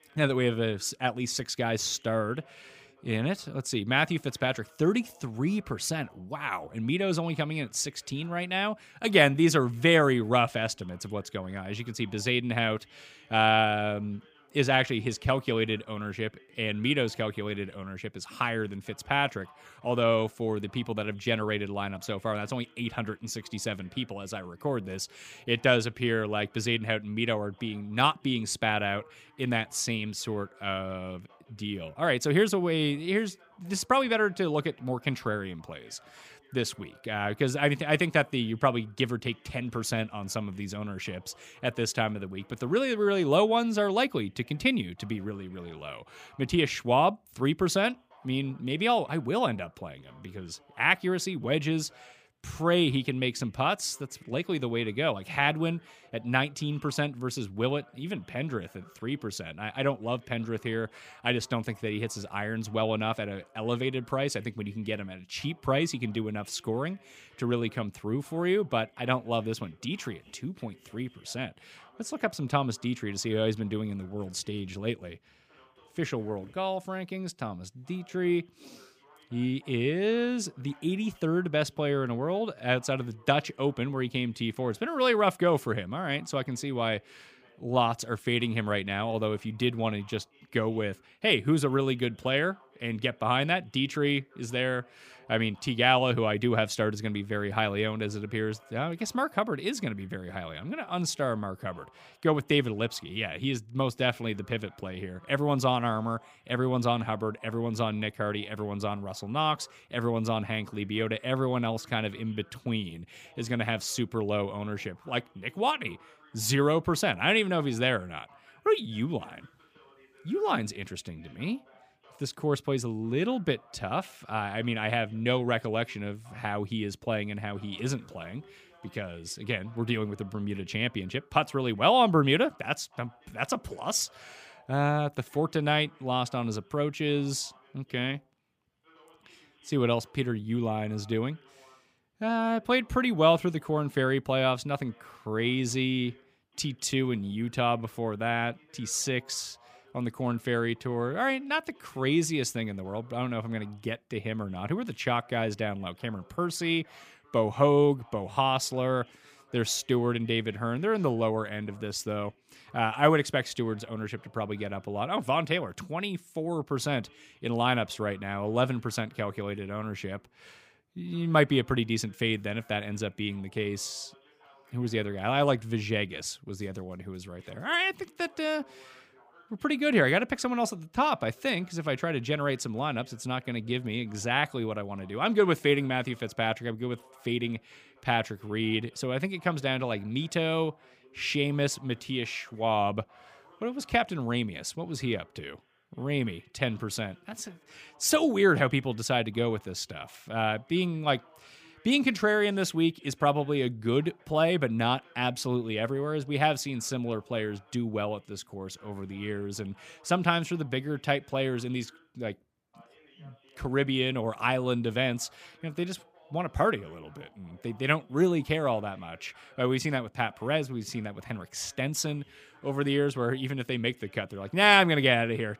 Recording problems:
voice in the background; faint; throughout; 30 dB below the speech

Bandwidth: 15 kHz